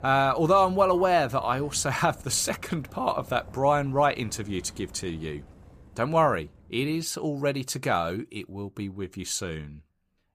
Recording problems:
traffic noise; faint; throughout; 20 dB below the speech

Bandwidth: 14.5 kHz